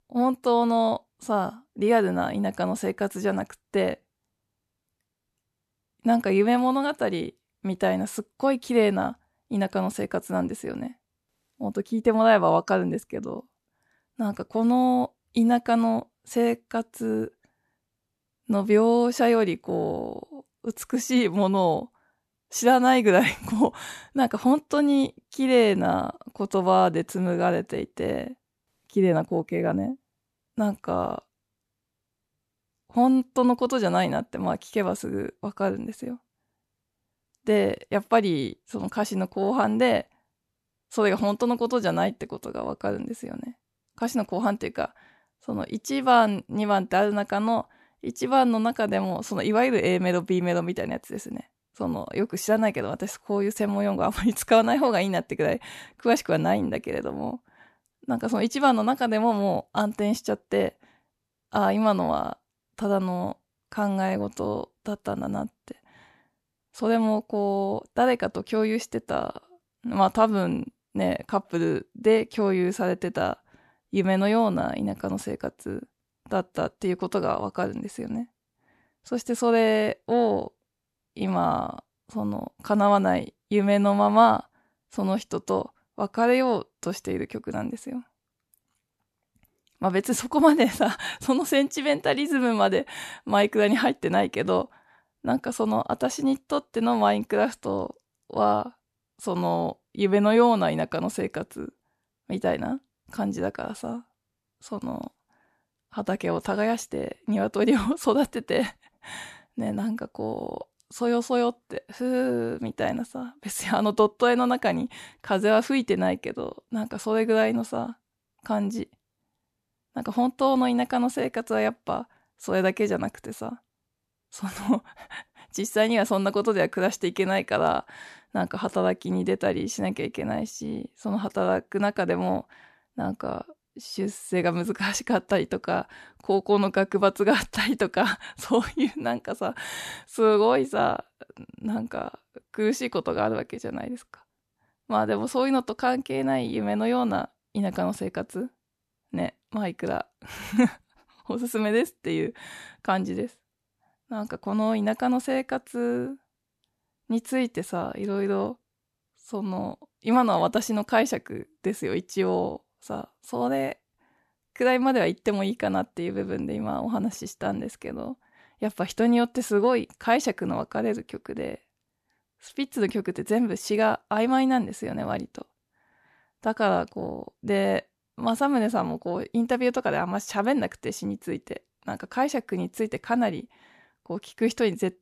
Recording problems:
none

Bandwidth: 13.5 kHz